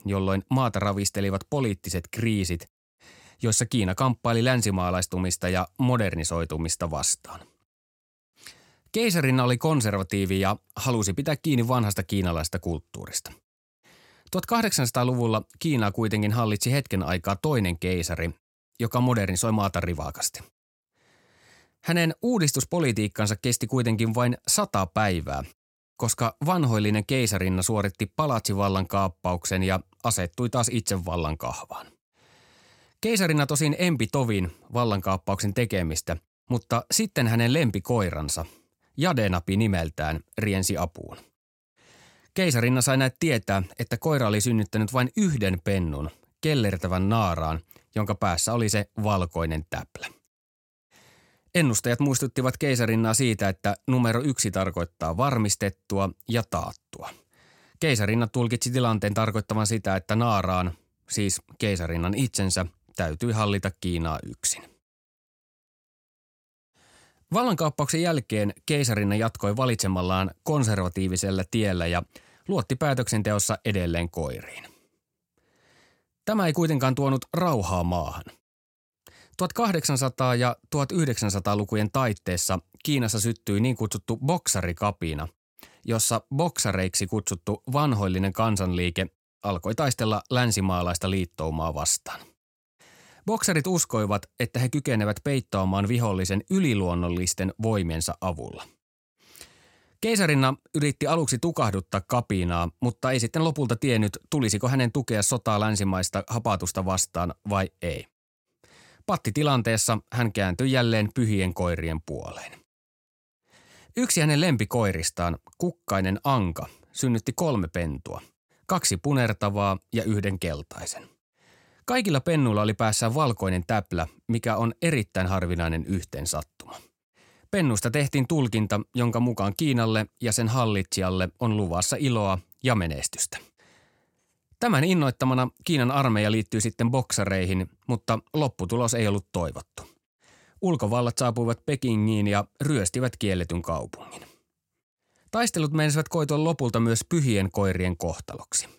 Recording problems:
none

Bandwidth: 16.5 kHz